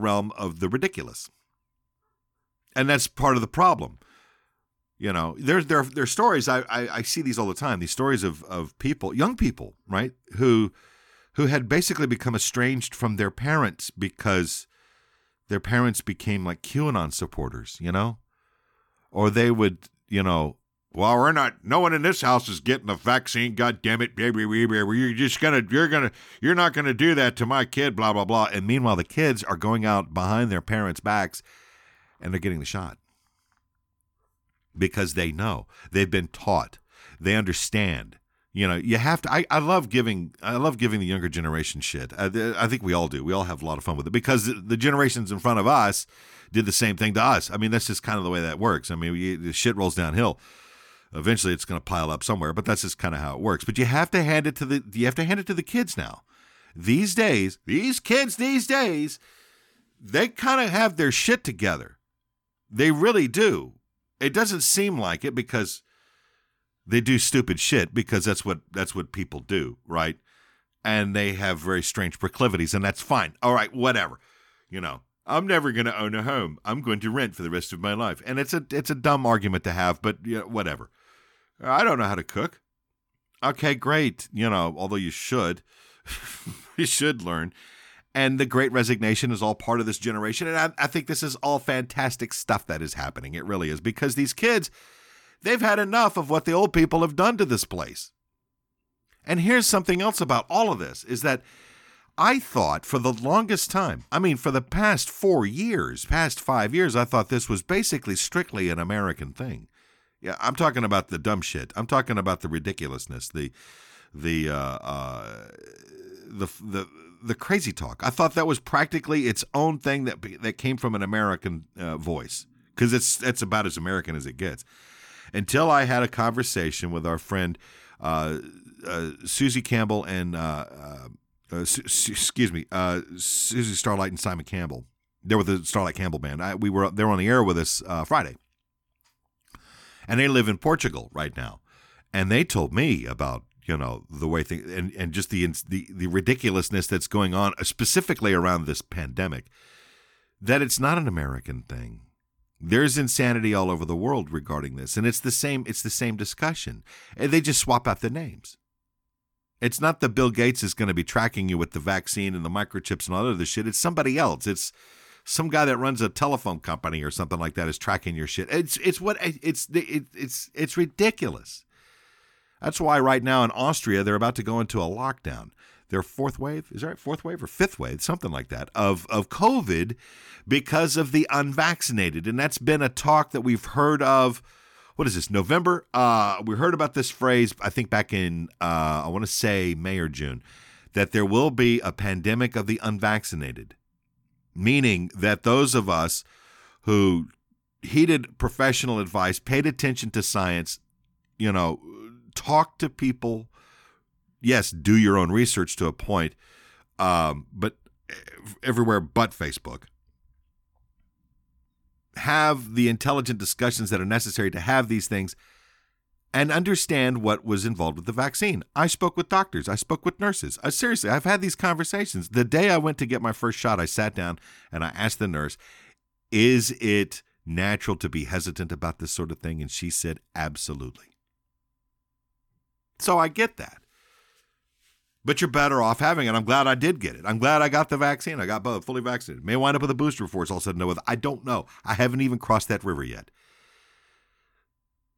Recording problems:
abrupt cut into speech; at the start

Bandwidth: 18 kHz